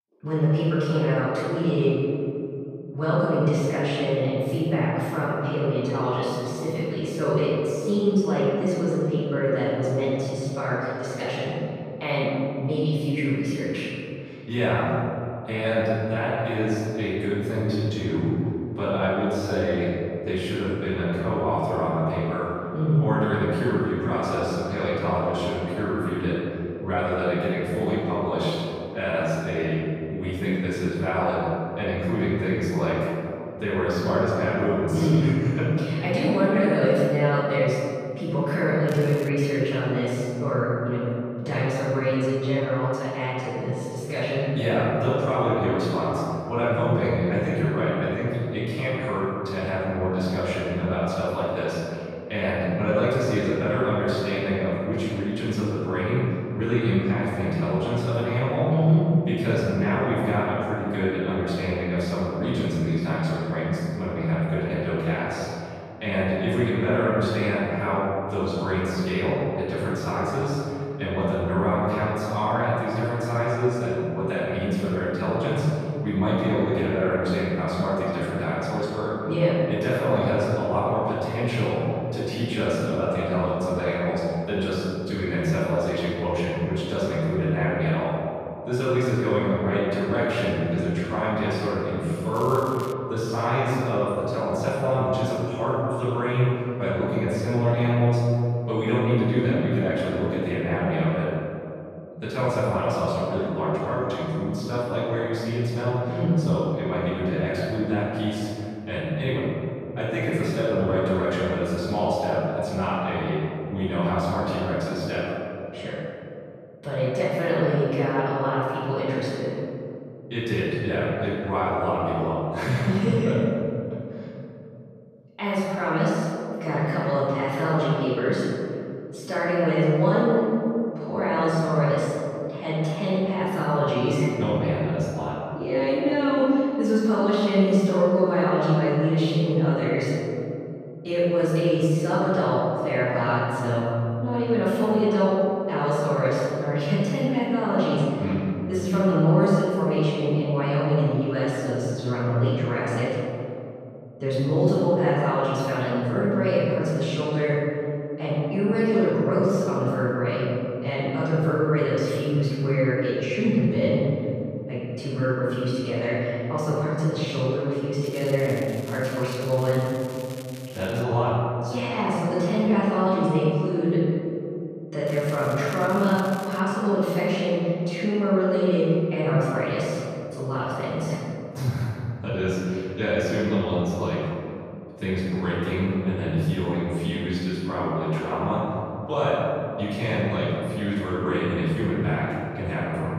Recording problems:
room echo; strong; dies away in 2.7 s
off-mic speech; far
crackling; faint; 4 times, first at 39 s; 20 dB below the speech

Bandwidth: 14.5 kHz